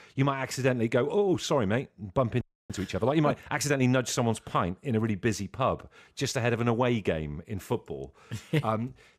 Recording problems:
audio freezing; at 2.5 s

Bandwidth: 14.5 kHz